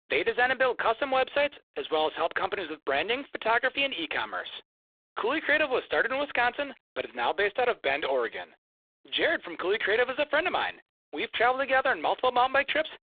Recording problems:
phone-call audio; poor line; nothing above 3.5 kHz

